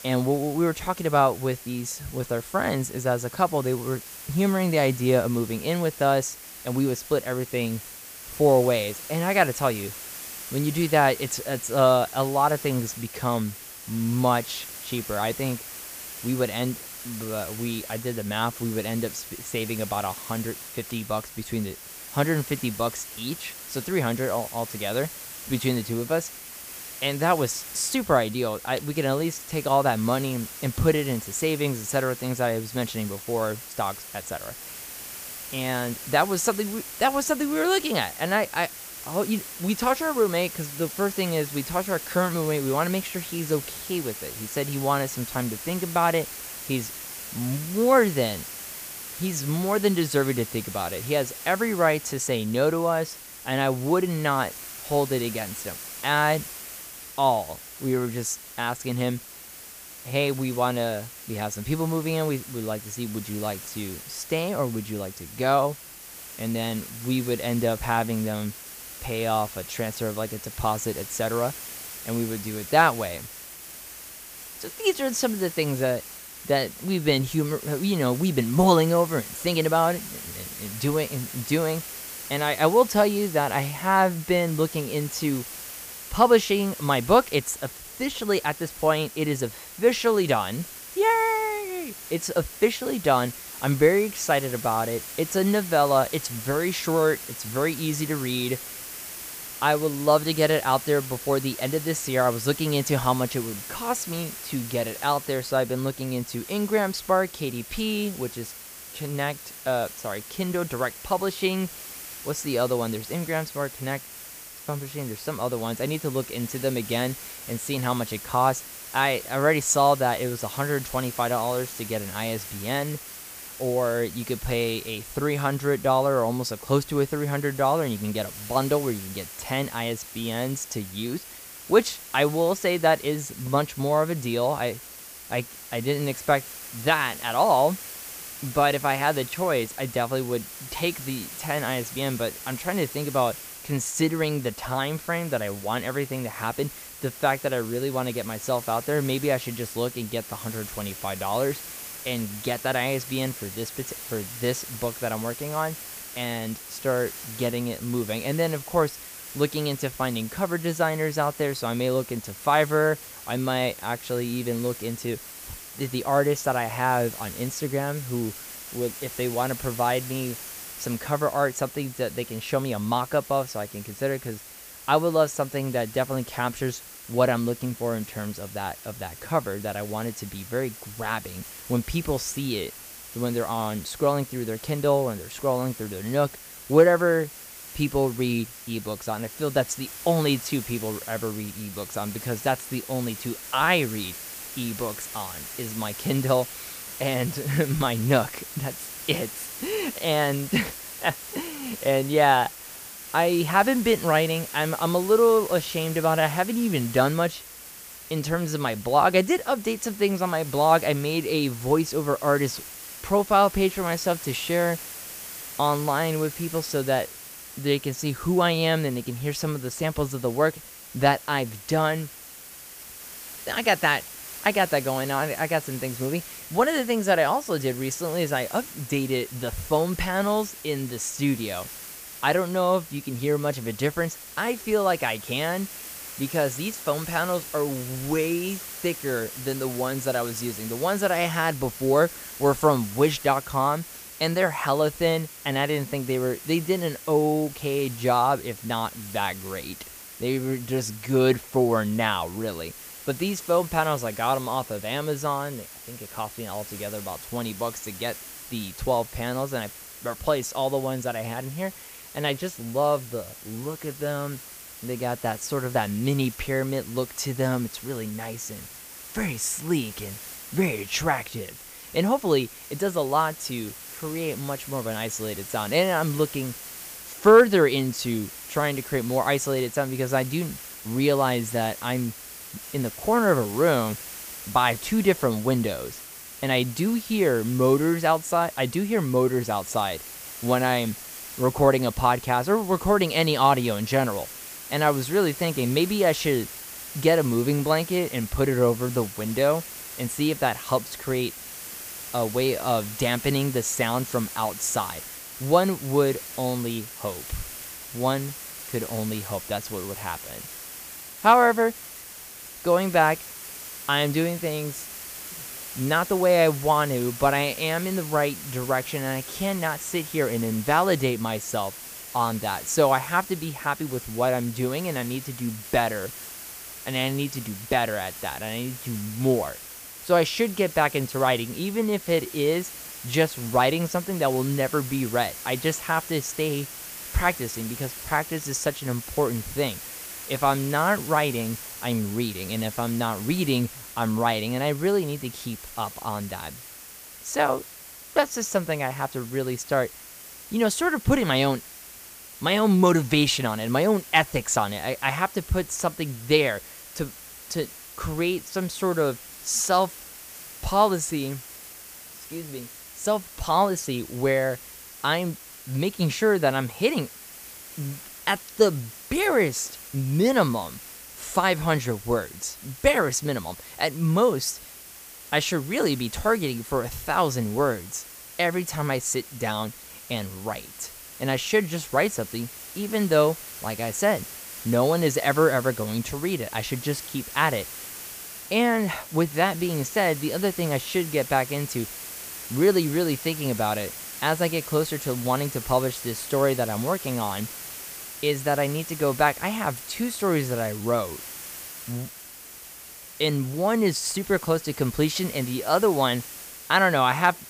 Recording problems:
hiss; noticeable; throughout; 10 dB below the speech

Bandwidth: 15 kHz